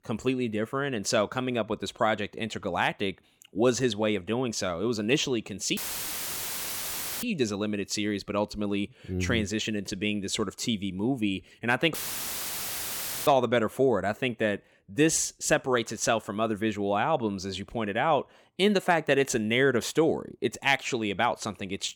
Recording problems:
audio cutting out; filled with static; at 6 s for 1.5 s and at 12 s for 1.5 s

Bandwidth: 18.5 kHz